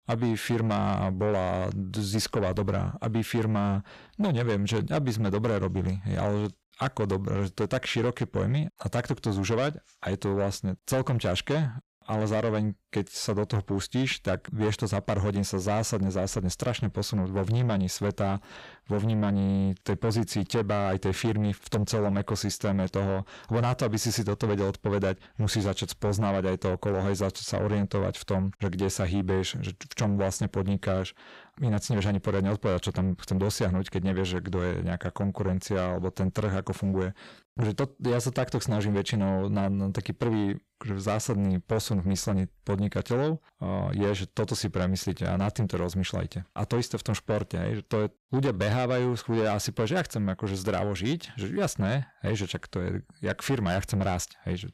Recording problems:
distortion; slight; 10 dB below the speech

